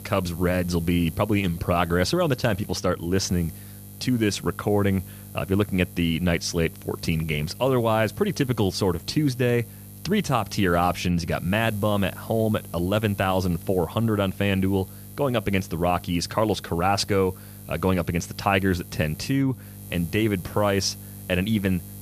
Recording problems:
electrical hum; faint; throughout; 50 Hz, 20 dB below the speech

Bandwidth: 15 kHz